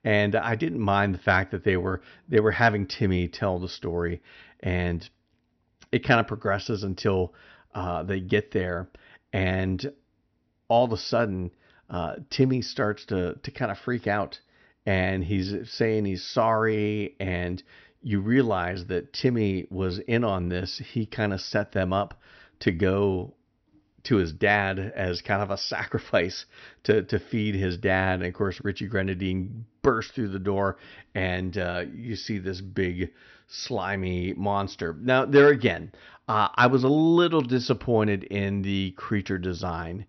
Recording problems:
high frequencies cut off; noticeable; nothing above 6 kHz

